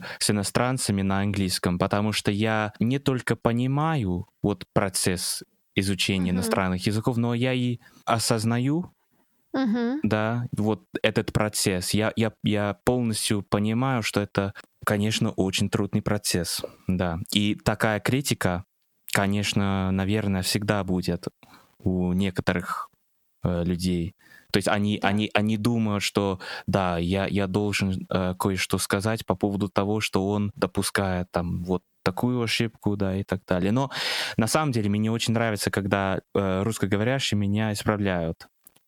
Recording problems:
squashed, flat; heavily

